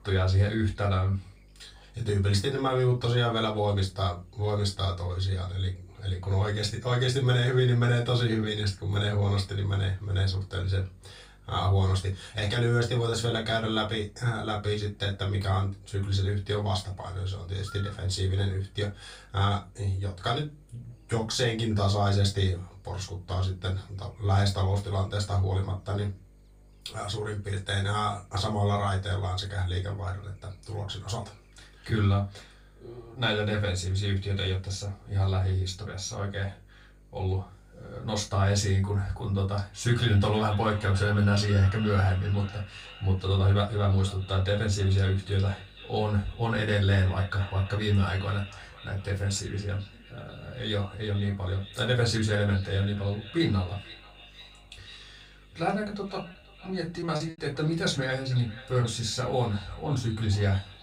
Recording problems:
off-mic speech; far
echo of what is said; noticeable; from 40 s on; 490 ms later, 20 dB below the speech
room echo; very slight; dies away in 0.2 s
electrical hum; faint; throughout; 50 Hz, 30 dB below the speech
choppy; very; at 57 s; 10% of the speech affected

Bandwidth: 15.5 kHz